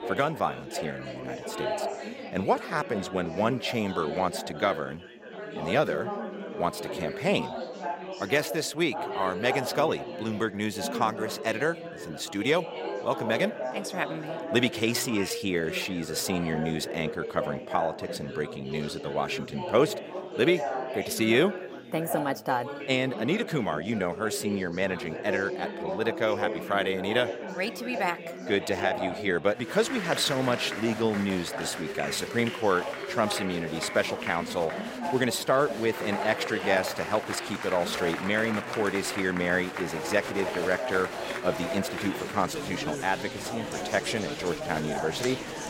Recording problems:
chatter from many people; loud; throughout; 6 dB below the speech

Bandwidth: 16 kHz